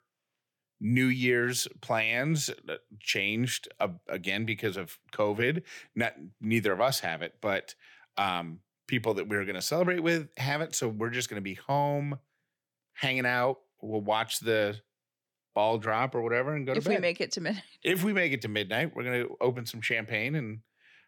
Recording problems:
none

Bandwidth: 18 kHz